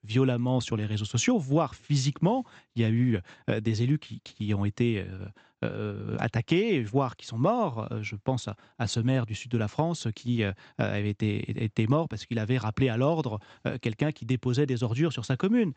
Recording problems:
high frequencies cut off; noticeable; nothing above 8 kHz

